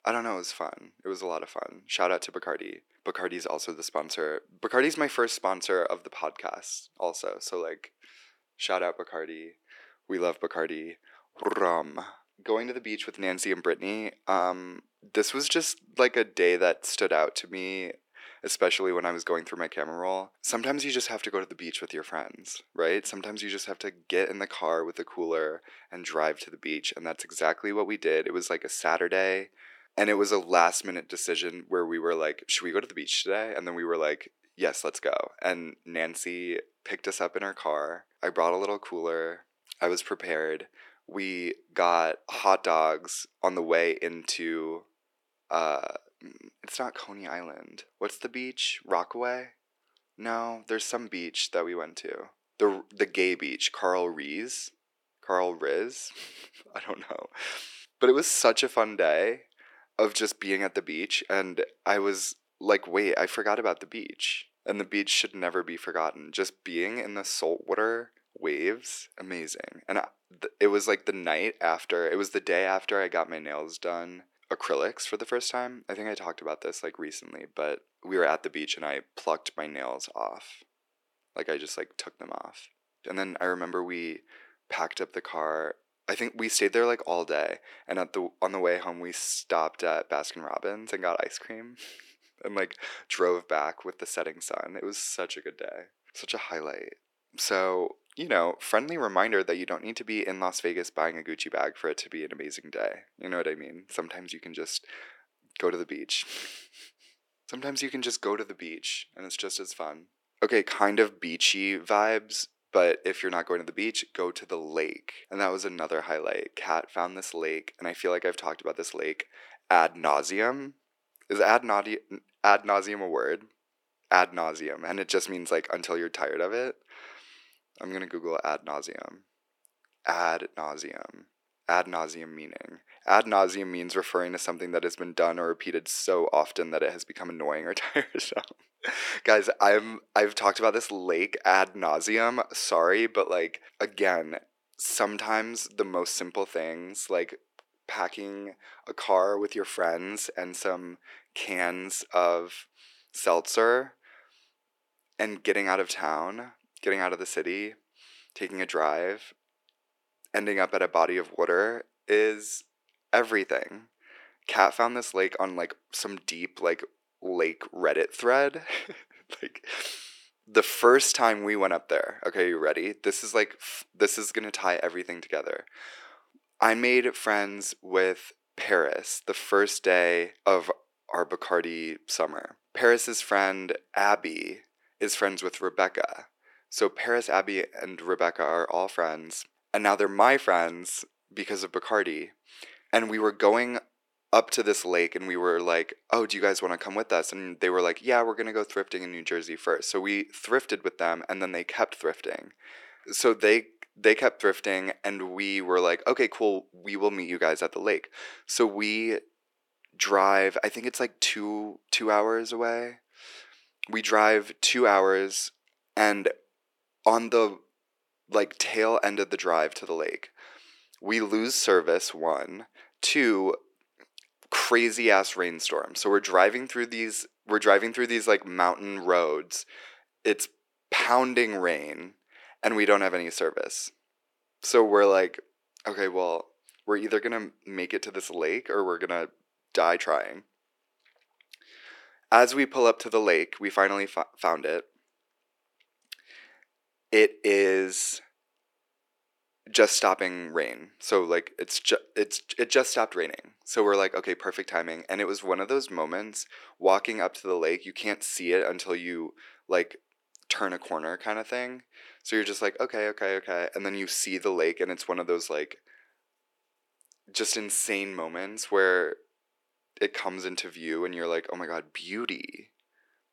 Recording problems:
thin; very; fading below 350 Hz

